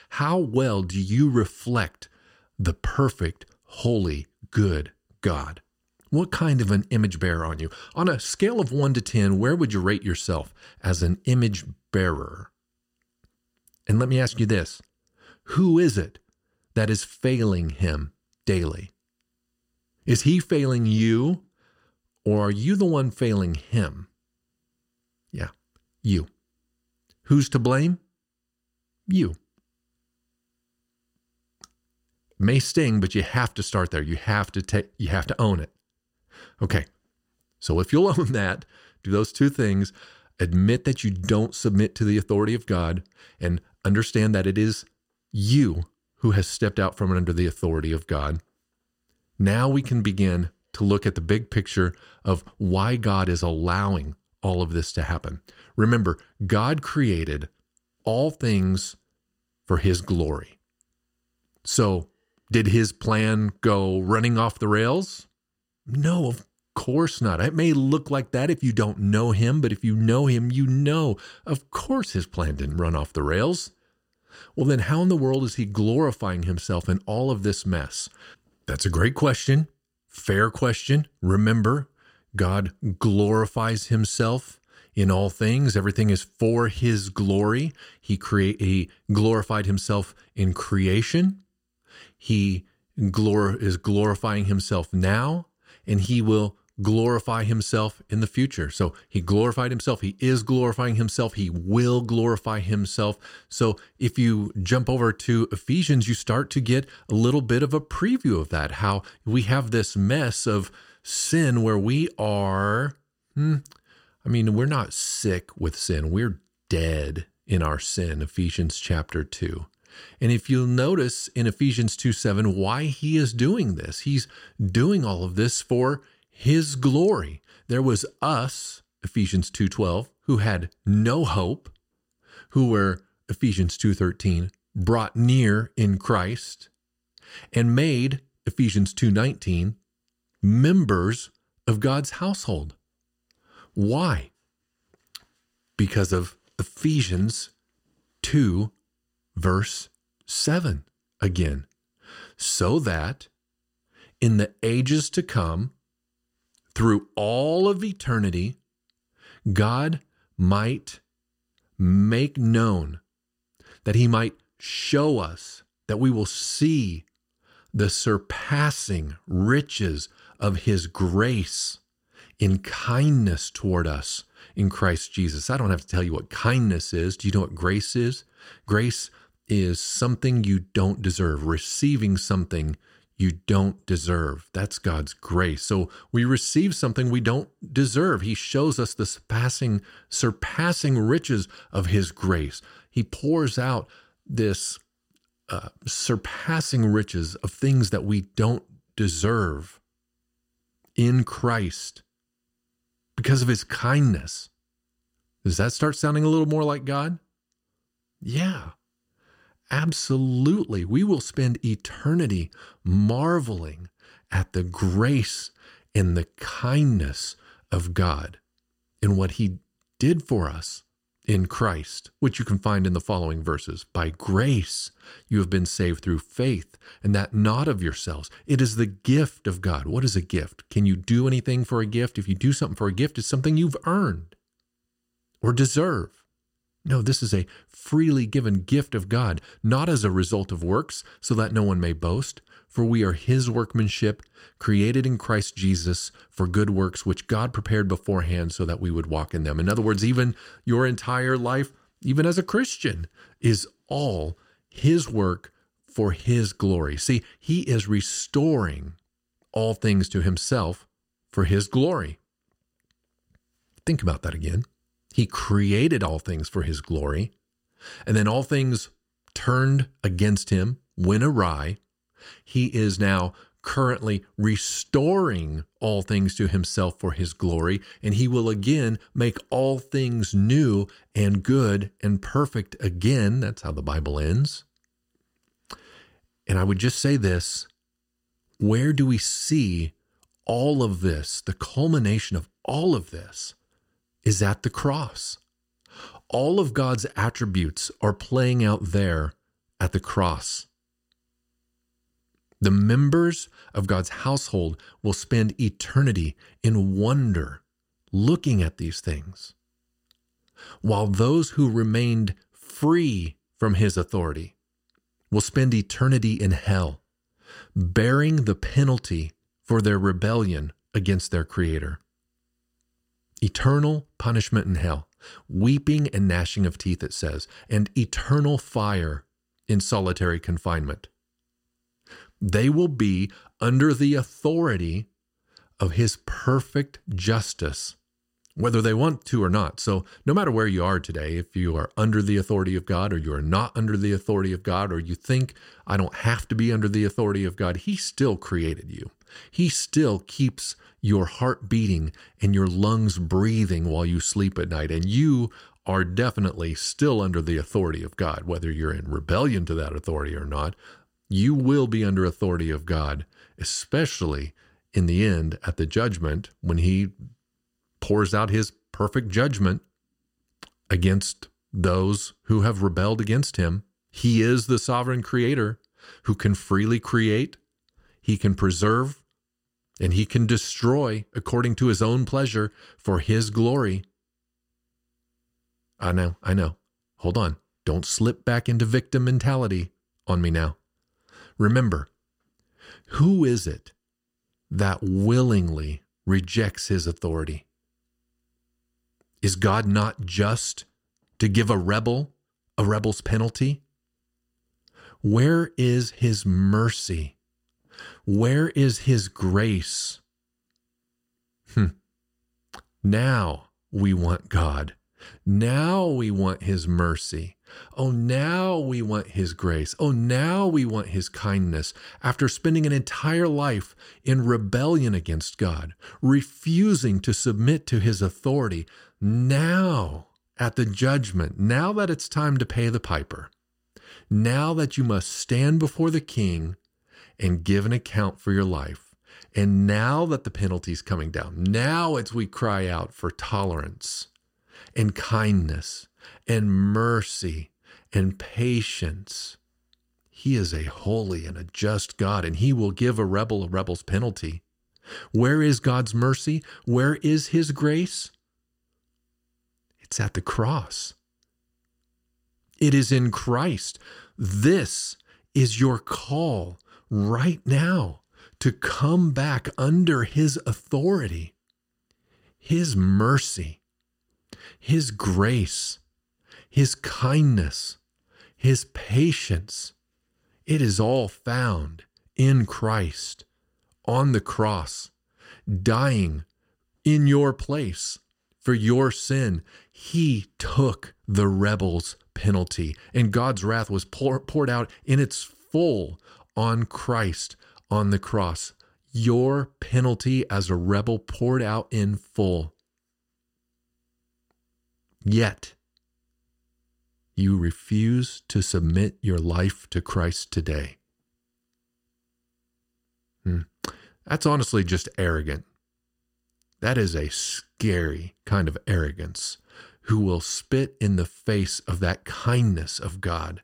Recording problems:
none

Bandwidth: 16 kHz